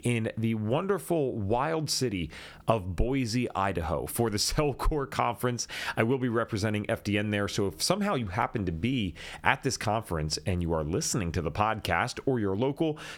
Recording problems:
squashed, flat; somewhat

